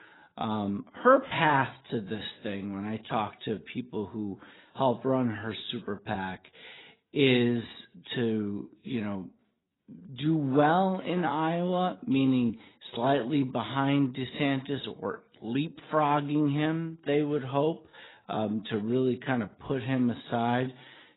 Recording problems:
garbled, watery; badly; nothing above 4 kHz
wrong speed, natural pitch; too slow; 0.7 times normal speed

